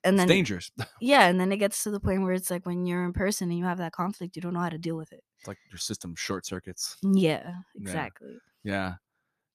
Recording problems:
none

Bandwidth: 14.5 kHz